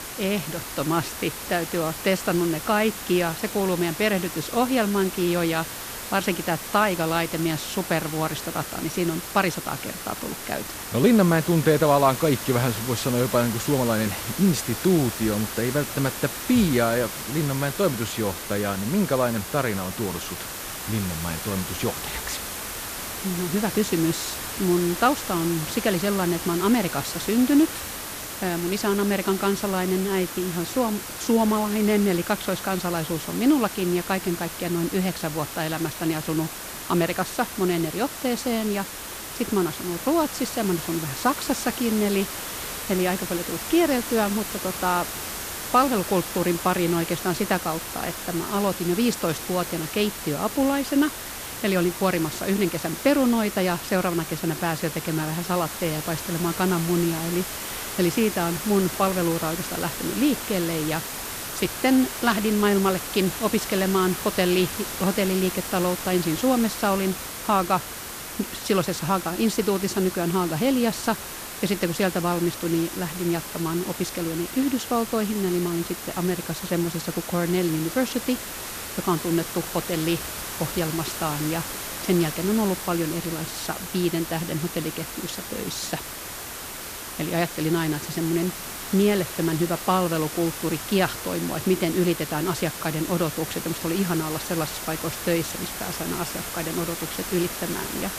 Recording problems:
hiss; loud; throughout; 7 dB below the speech

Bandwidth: 14.5 kHz